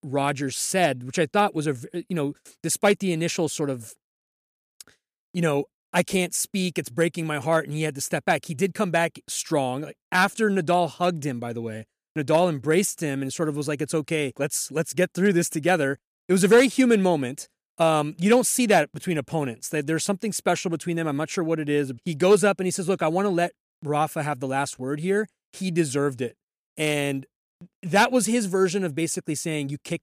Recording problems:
none

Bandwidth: 14.5 kHz